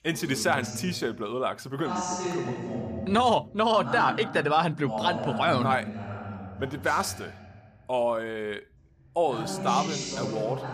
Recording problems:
voice in the background; loud; throughout; 7 dB below the speech

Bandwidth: 15 kHz